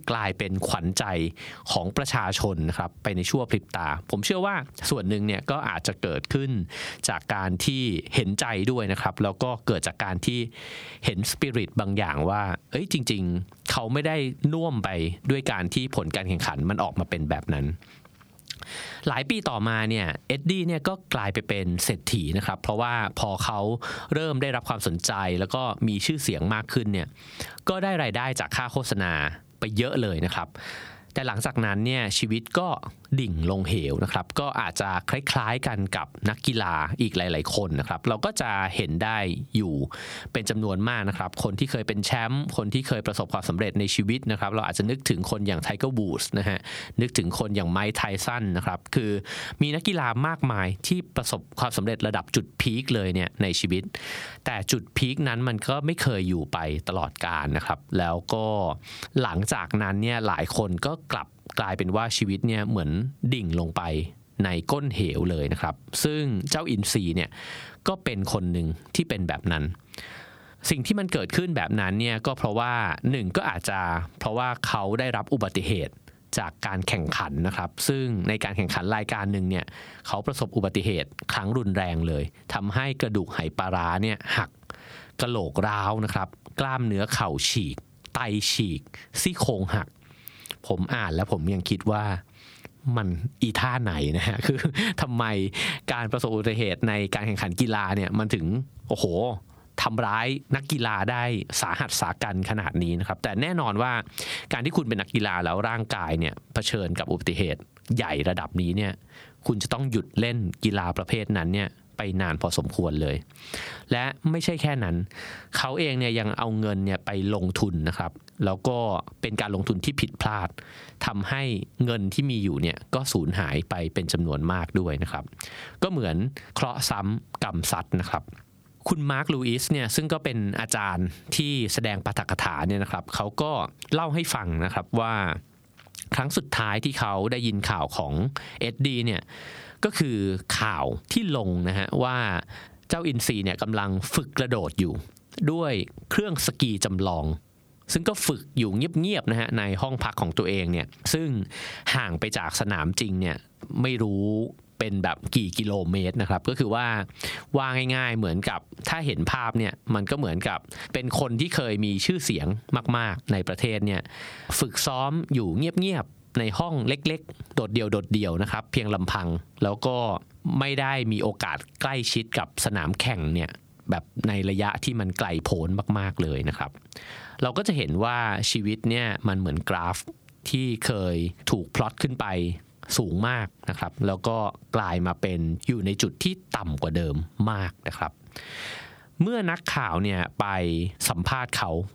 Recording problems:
squashed, flat; somewhat

